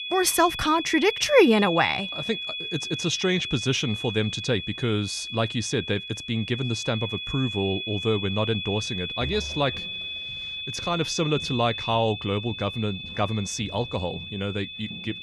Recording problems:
high-pitched whine; loud; throughout; 3.5 kHz, 6 dB below the speech
footsteps; faint; from 8.5 s on; peak 10 dB below the speech

